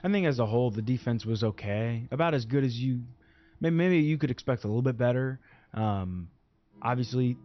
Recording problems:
high frequencies cut off; noticeable; nothing above 6 kHz
background music; faint; throughout; 30 dB below the speech

